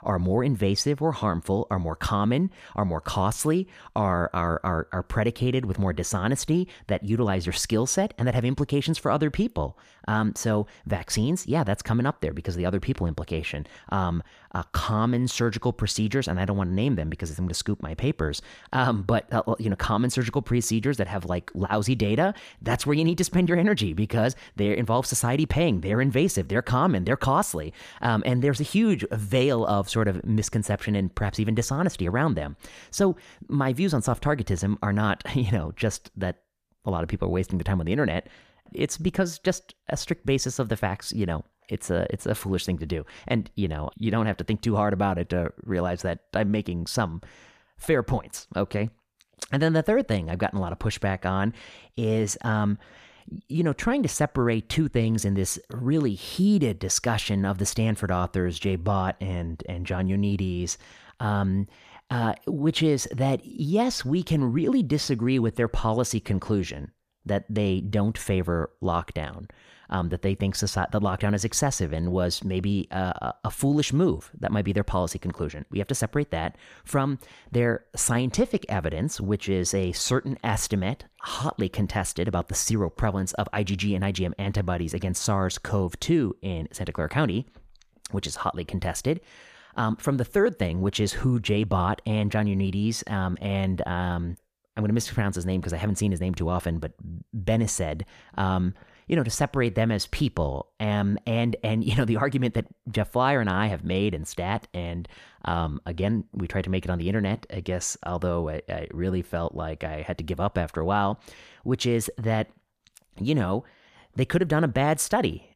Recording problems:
none

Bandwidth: 14.5 kHz